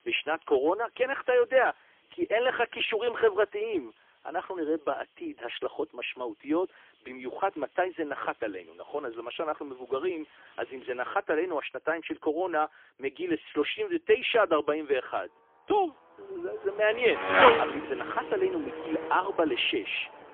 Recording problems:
phone-call audio; poor line; nothing above 3.5 kHz
traffic noise; very loud; throughout; 2 dB above the speech

